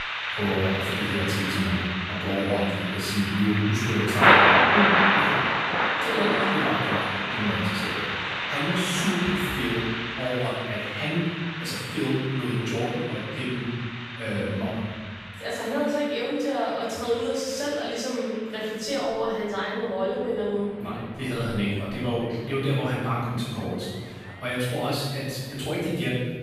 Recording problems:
room echo; strong; dies away in 1.4 s
off-mic speech; far
rain or running water; very loud; throughout; 4 dB above the speech

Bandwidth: 14.5 kHz